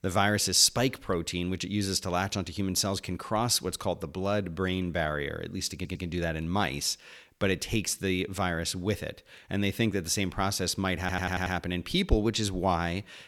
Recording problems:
audio stuttering; at 6 s and at 11 s

